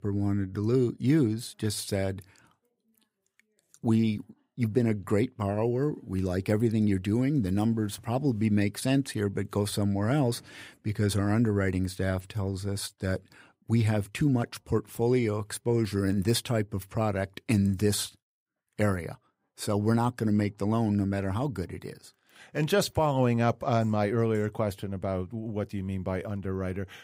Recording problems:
none

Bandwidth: 15.5 kHz